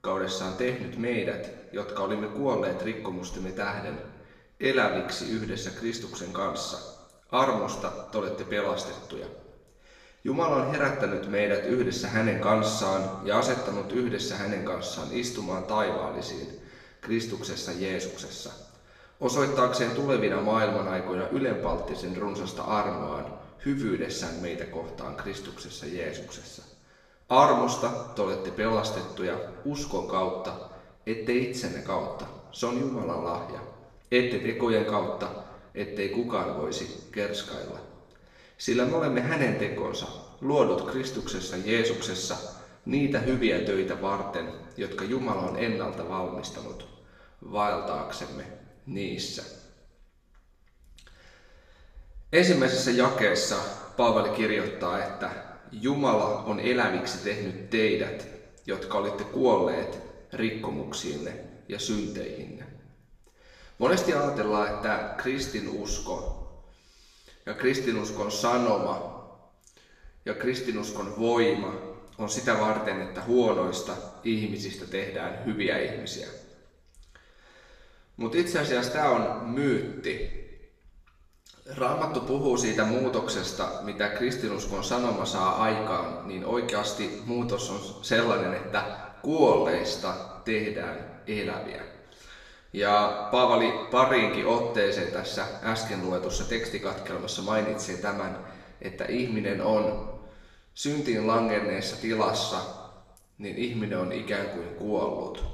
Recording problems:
off-mic speech; far
room echo; noticeable; dies away in 1 s

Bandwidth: 14.5 kHz